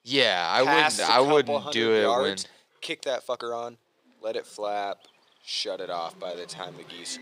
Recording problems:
thin; somewhat; fading below 450 Hz
animal sounds; faint; throughout; 30 dB below the speech
uneven, jittery; strongly; from 1 to 6.5 s

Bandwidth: 15.5 kHz